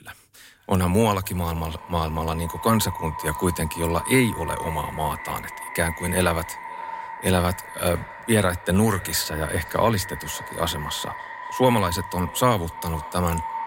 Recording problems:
echo of what is said; strong; throughout; 520 ms later, 10 dB below the speech

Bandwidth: 16 kHz